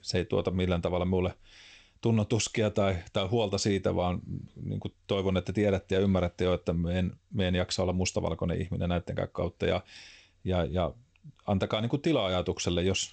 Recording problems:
garbled, watery; slightly; nothing above 8 kHz

